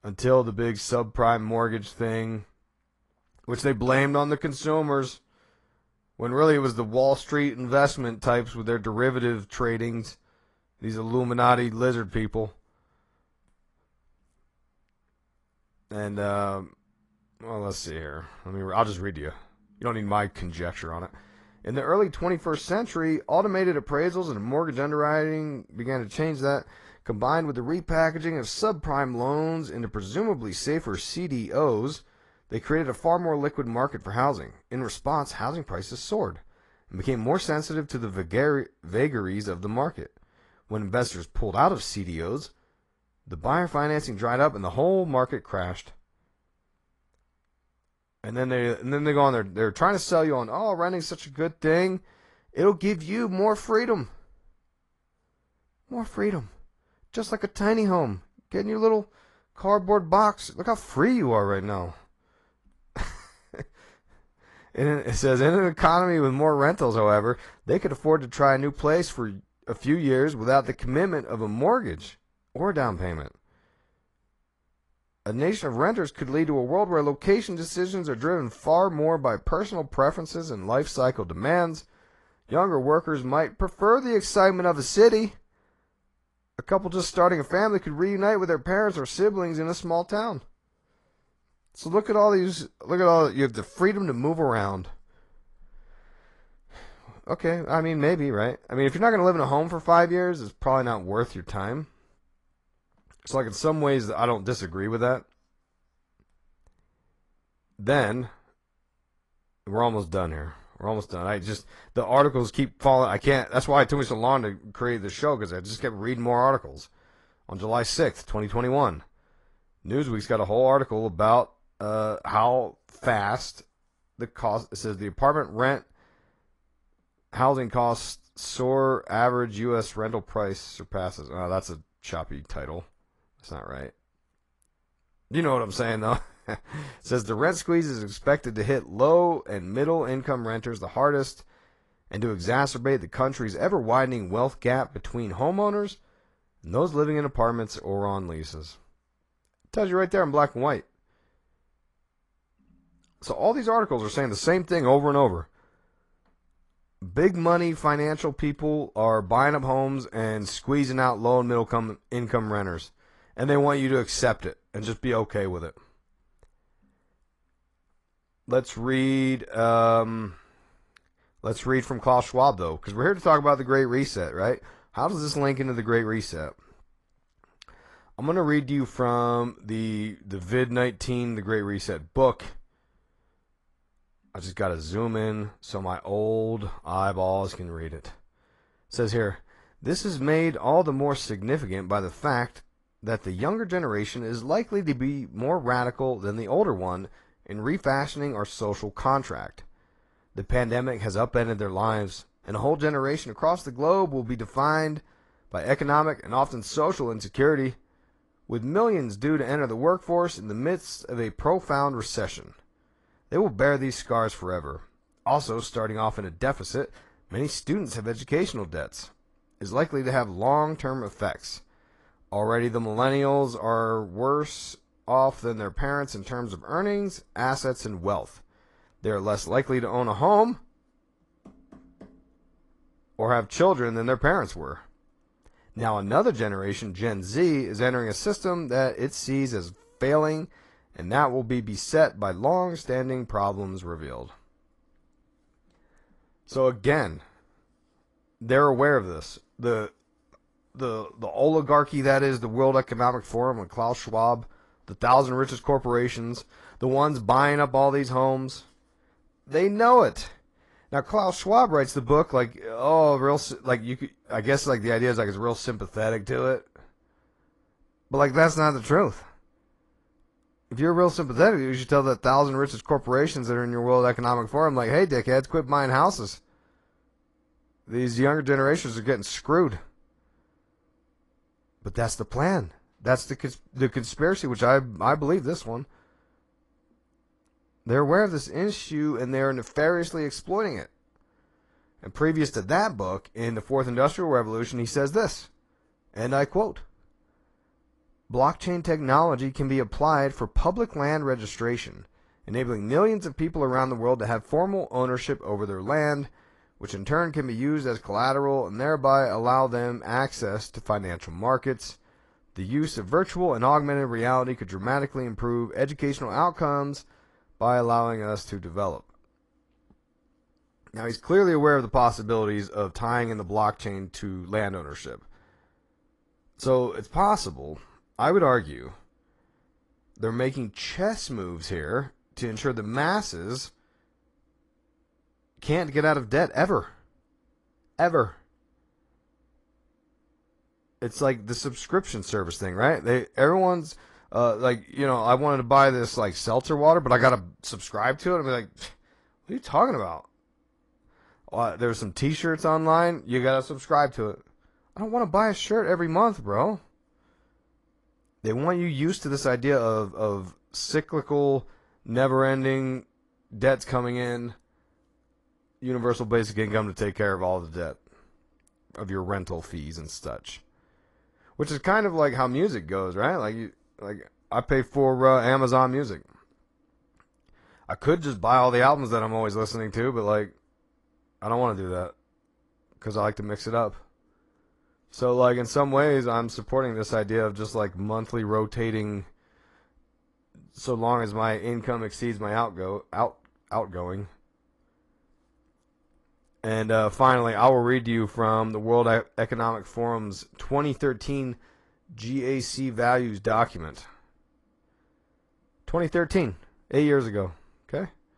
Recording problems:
garbled, watery; slightly; nothing above 10.5 kHz

